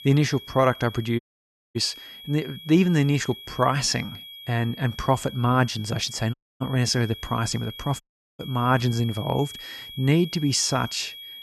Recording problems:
high-pitched whine; noticeable; throughout; 3.5 kHz, 15 dB below the speech
audio cutting out; at 1 s for 0.5 s, at 6.5 s and at 8 s

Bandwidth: 13.5 kHz